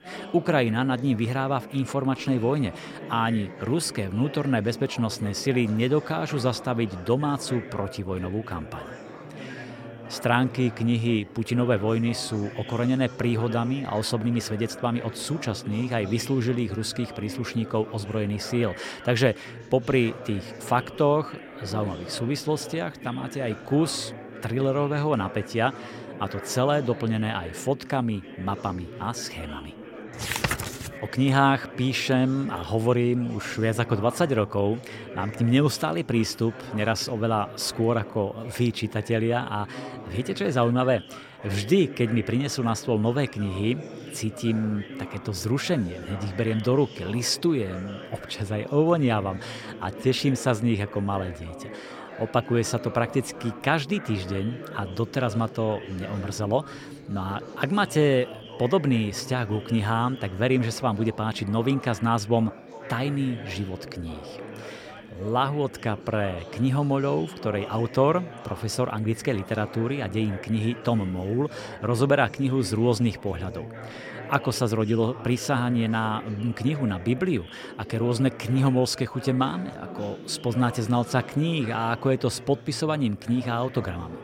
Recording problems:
chatter from many people; noticeable; throughout; 15 dB below the speech

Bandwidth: 16 kHz